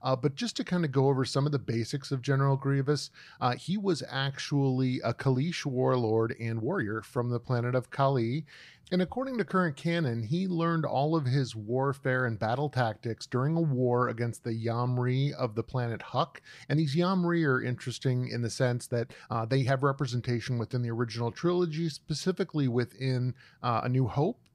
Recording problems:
uneven, jittery; strongly; from 3.5 to 24 s

